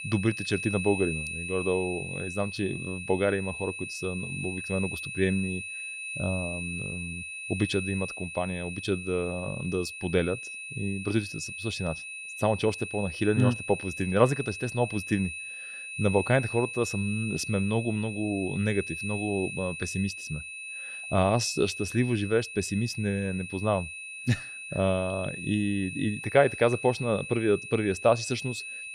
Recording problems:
high-pitched whine; loud; throughout; 2.5 kHz, 7 dB below the speech

